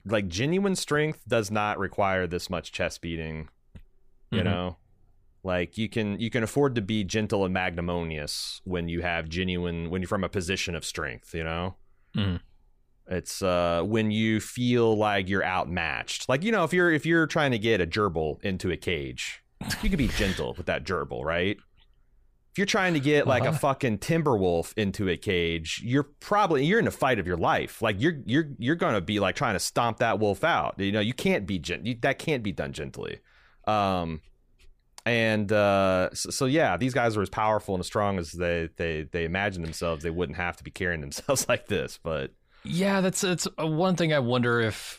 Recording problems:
none

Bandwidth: 15 kHz